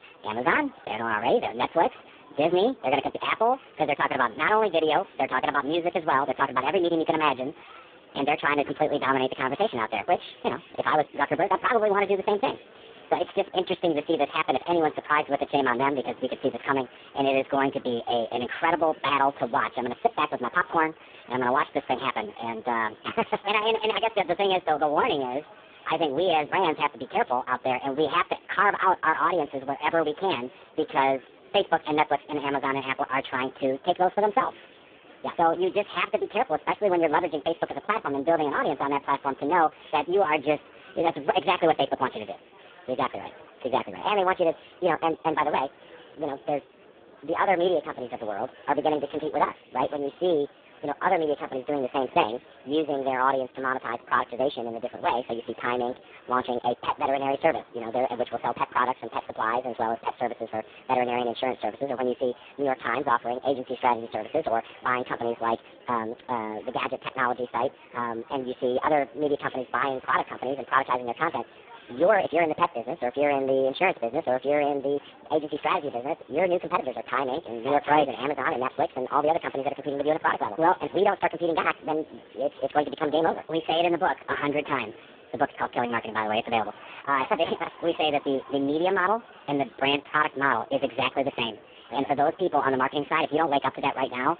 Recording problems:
phone-call audio; poor line
wrong speed and pitch; too fast and too high; 1.5 times normal speed
murmuring crowd; faint; throughout; 25 dB below the speech

